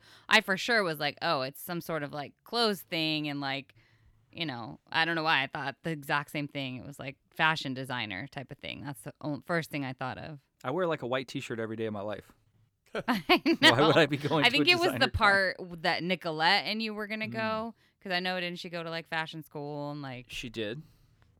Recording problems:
none

